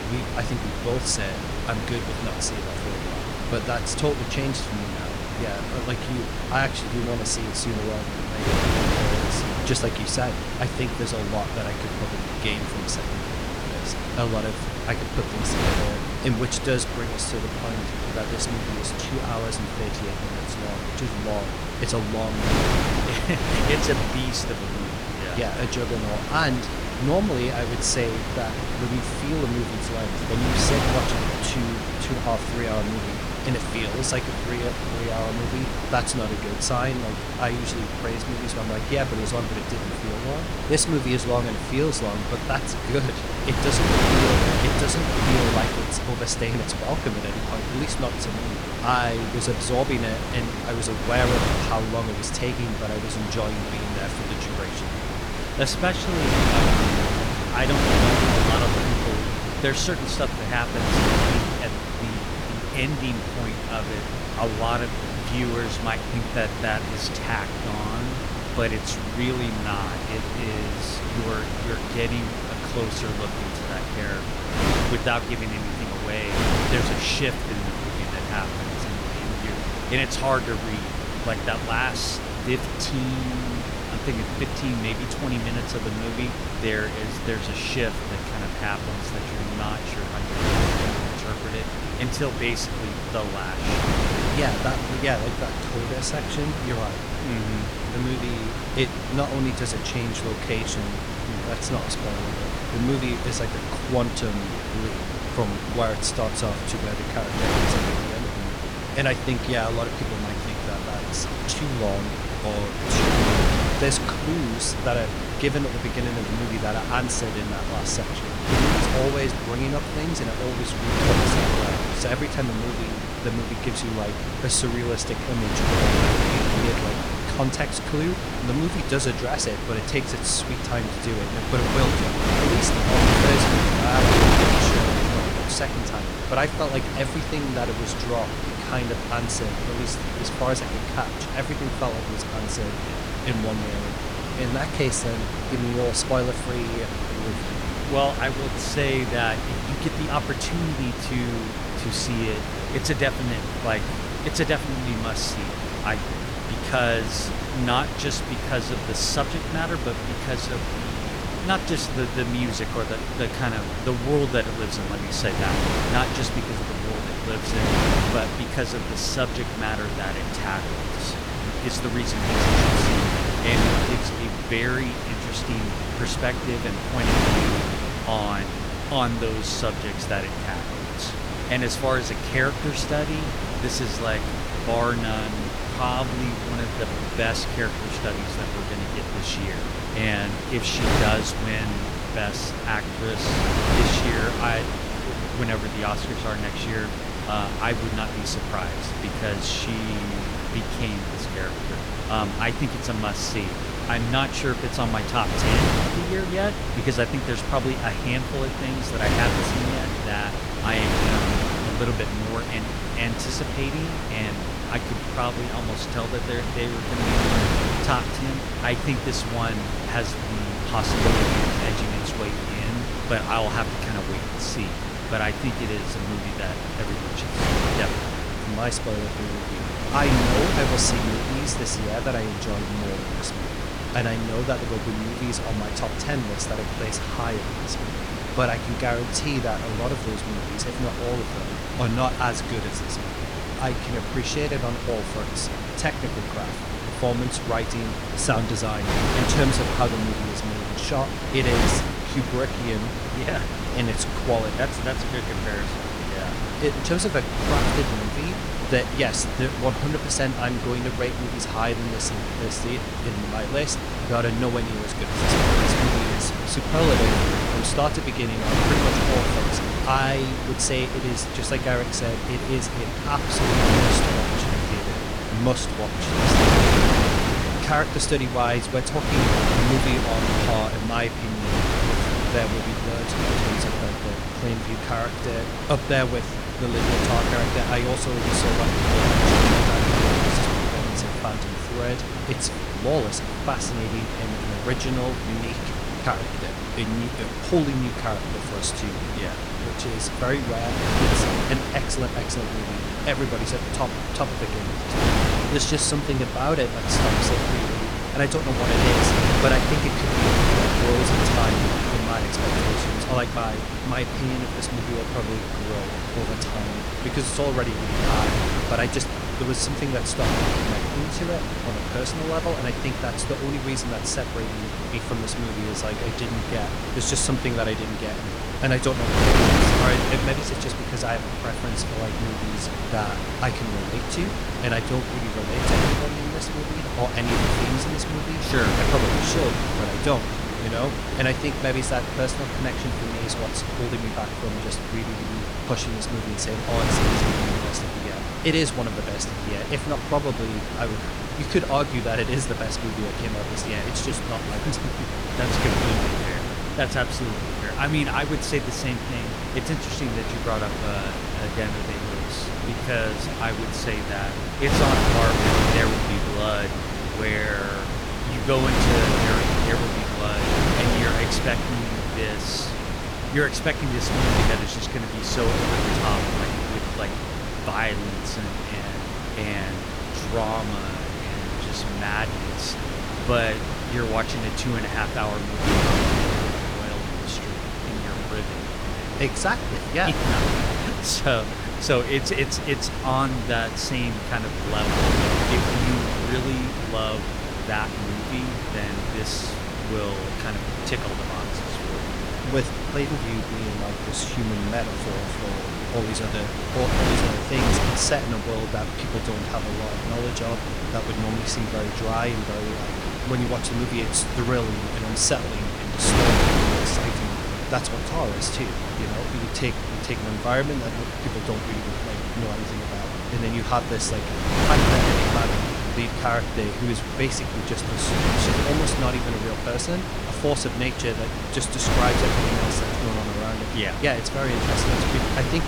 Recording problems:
wind noise on the microphone; heavy; 1 dB above the speech

